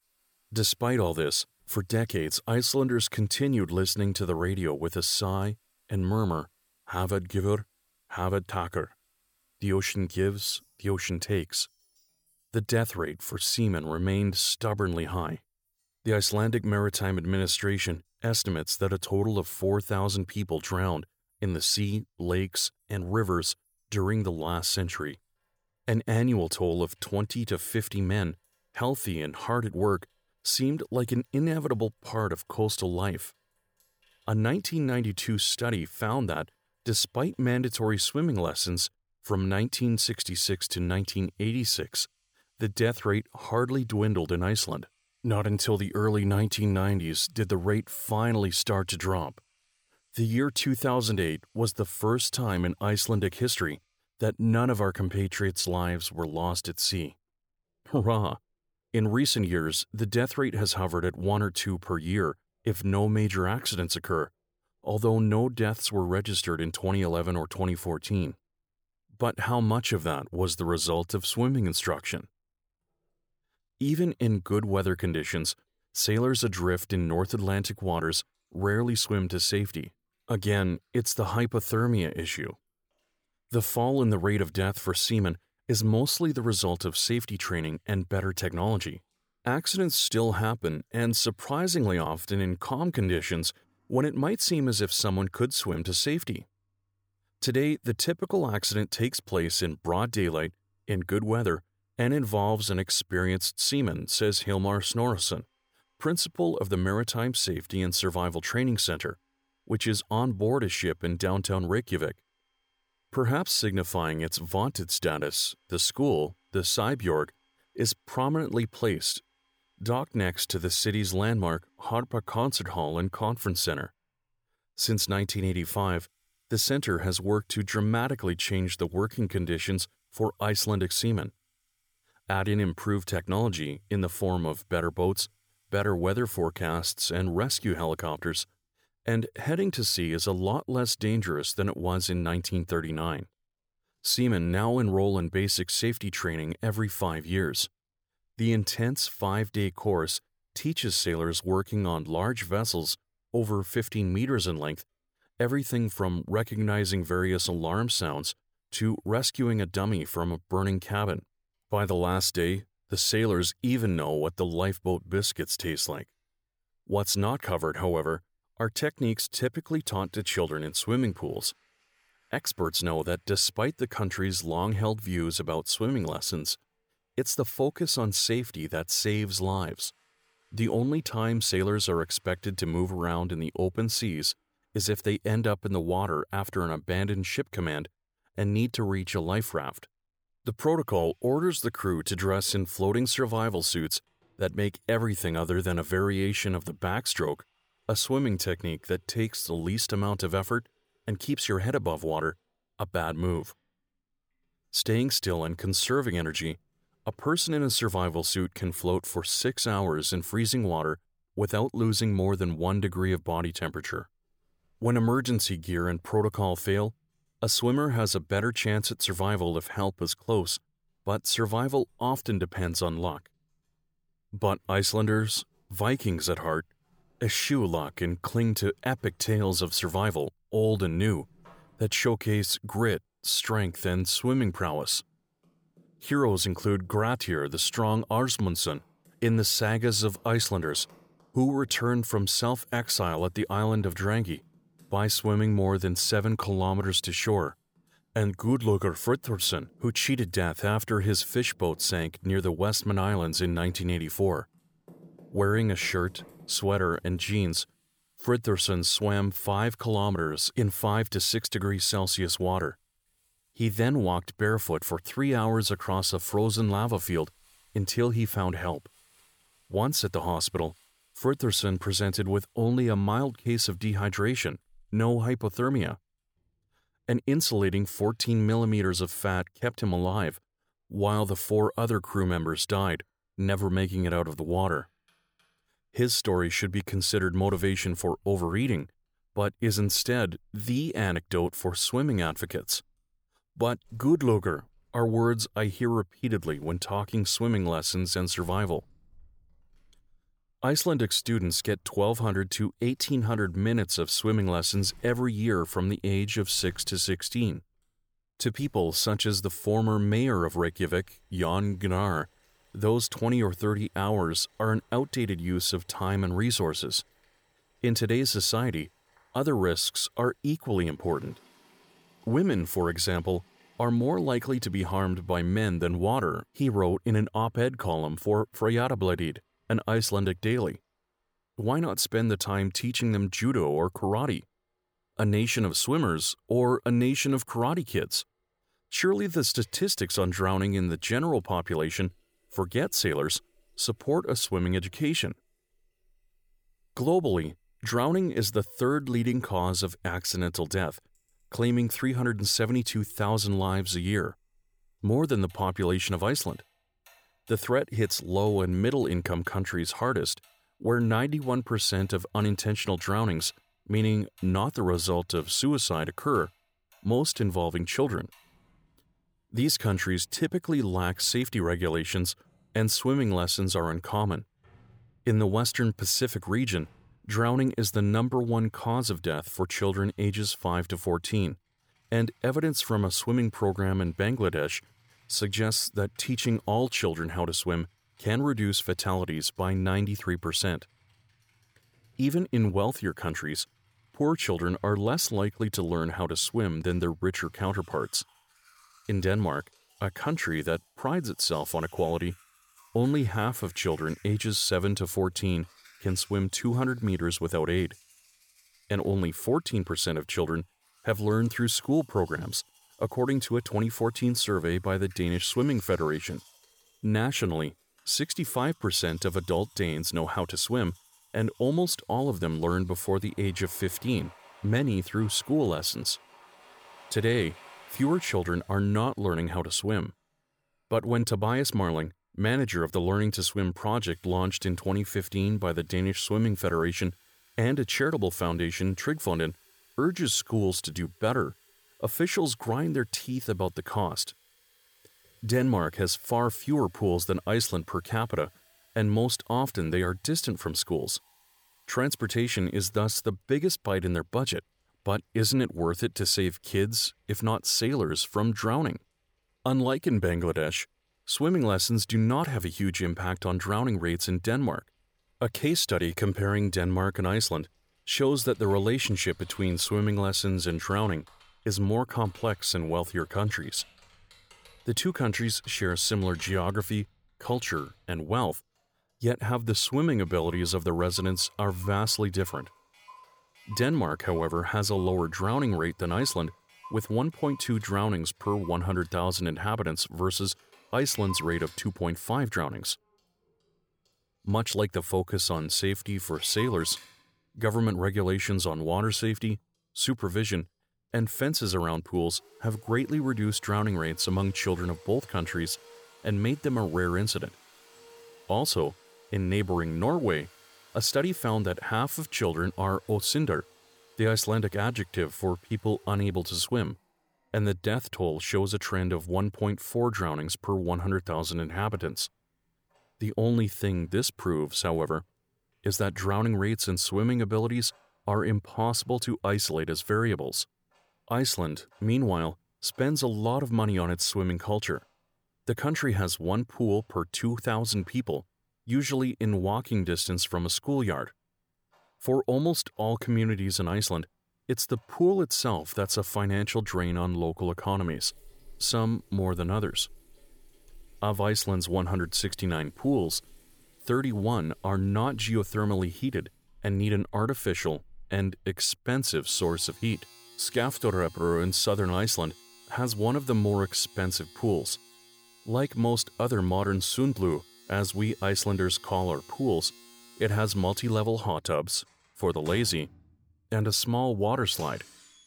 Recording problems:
household noises; faint; throughout; 30 dB below the speech

